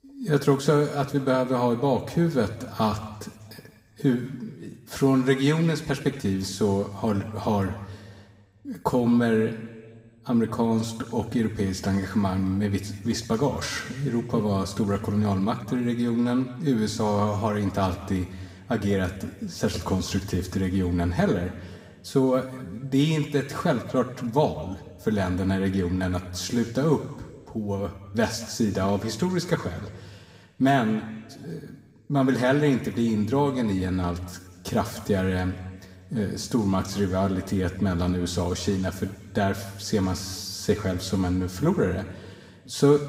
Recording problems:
room echo; slight; dies away in 1.4 s
off-mic speech; somewhat distant

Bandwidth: 15.5 kHz